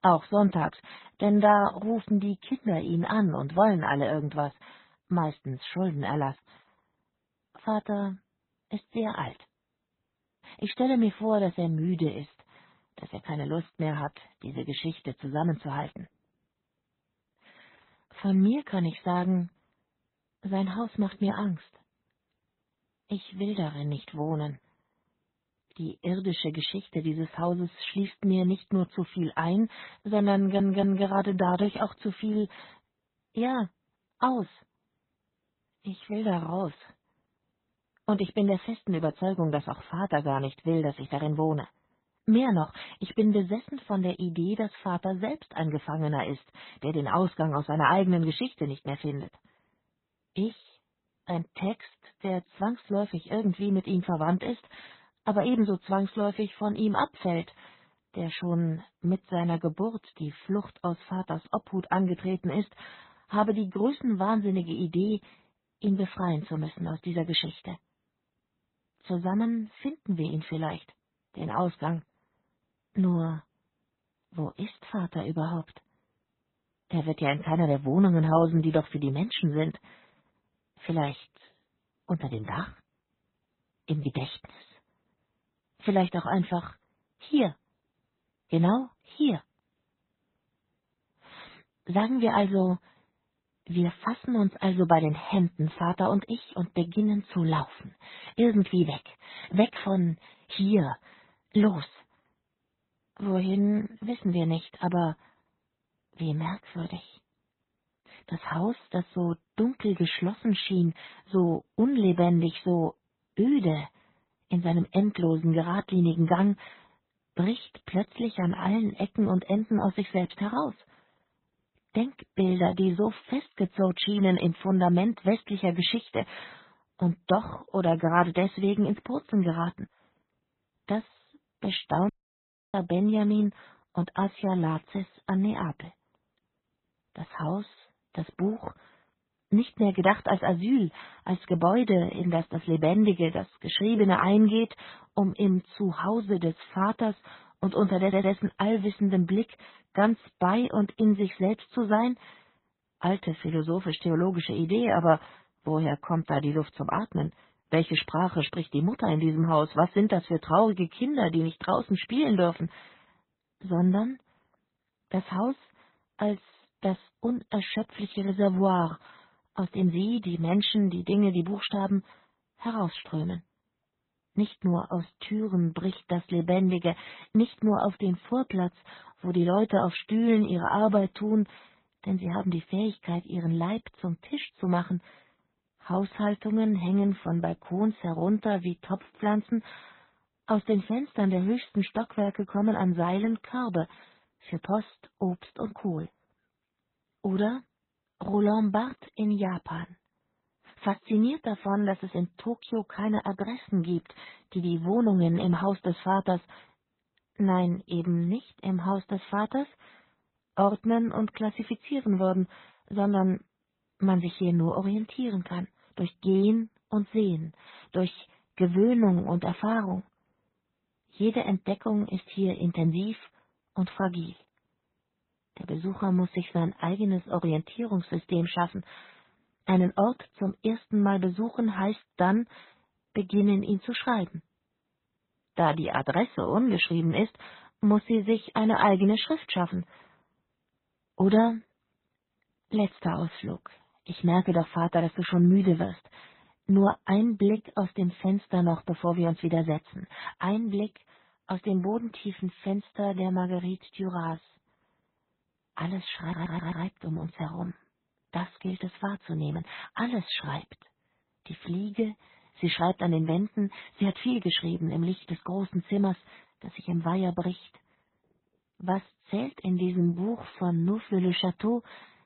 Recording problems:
garbled, watery; badly; nothing above 4 kHz
audio stuttering; at 30 s, at 2:28 and at 4:16
audio cutting out; at 2:12 for 0.5 s

